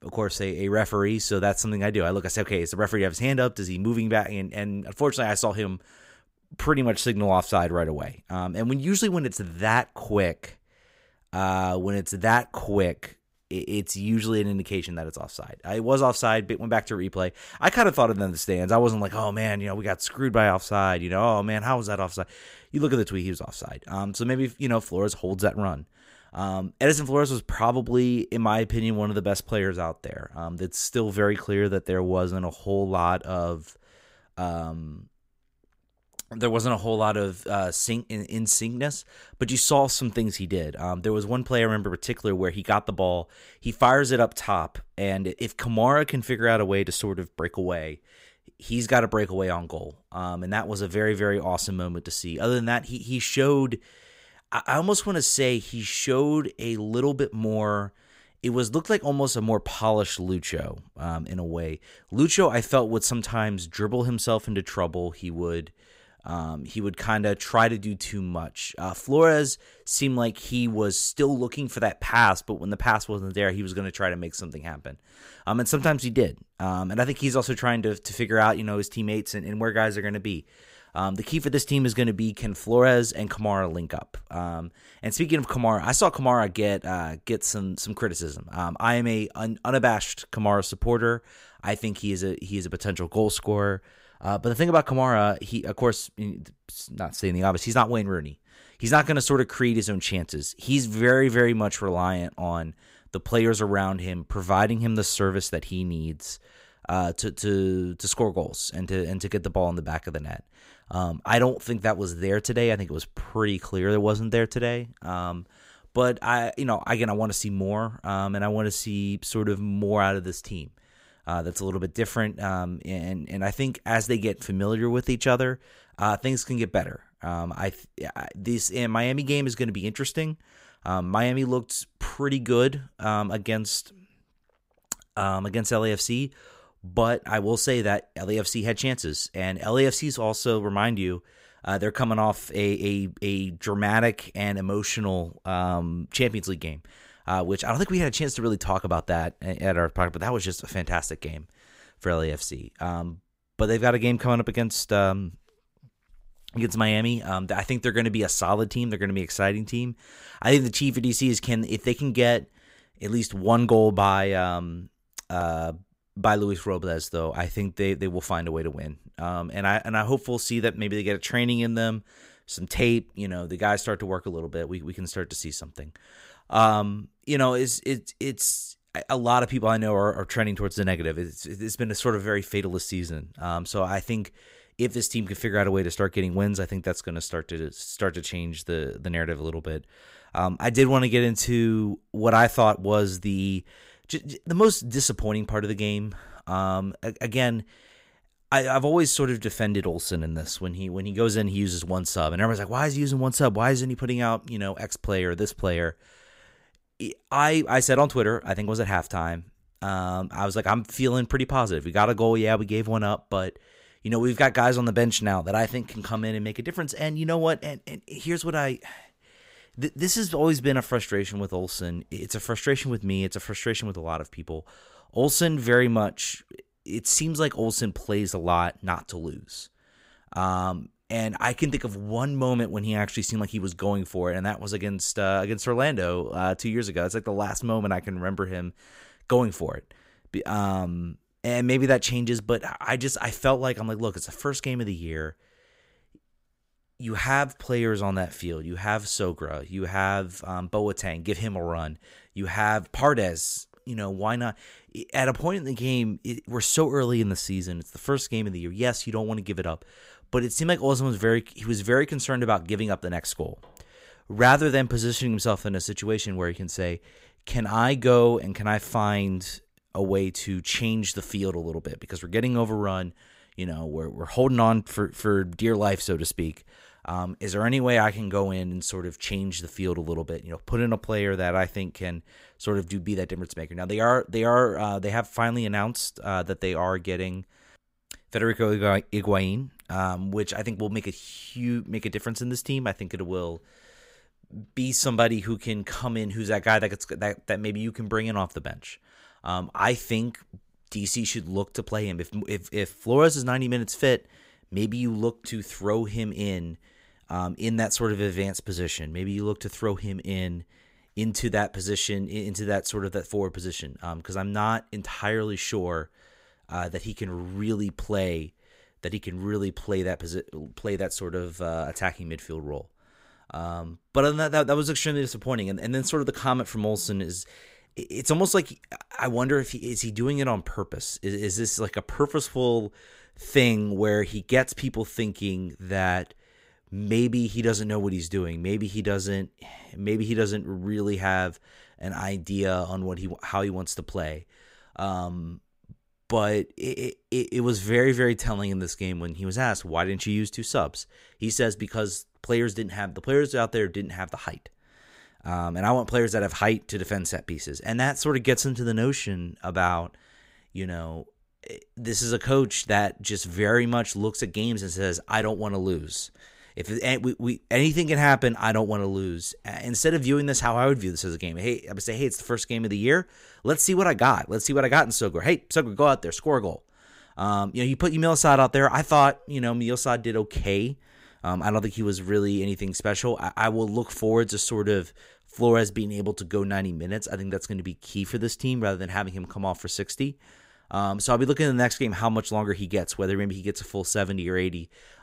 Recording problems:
none

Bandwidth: 15.5 kHz